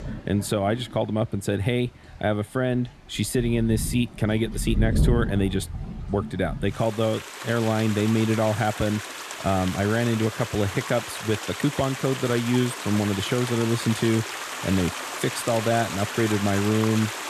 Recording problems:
rain or running water; loud; throughout; 7 dB below the speech

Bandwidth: 13.5 kHz